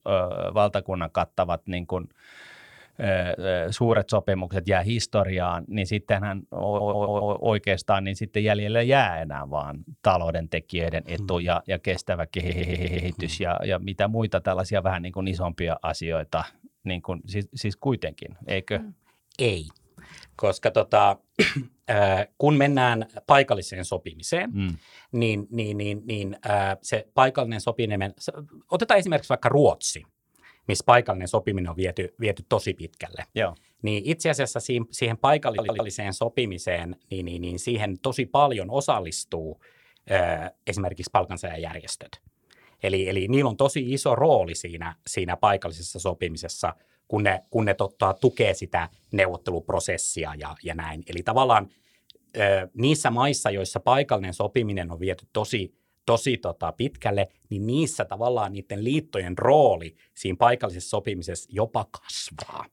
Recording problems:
audio stuttering; at 6.5 s, at 12 s and at 35 s

